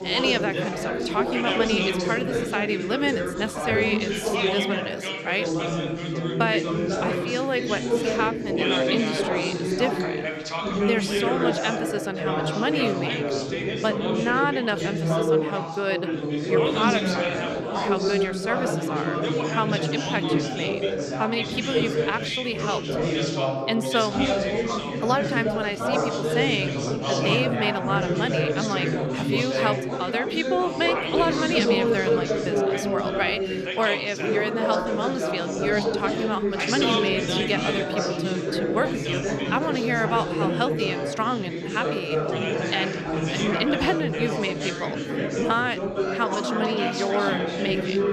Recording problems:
chatter from many people; very loud; throughout; 2 dB above the speech

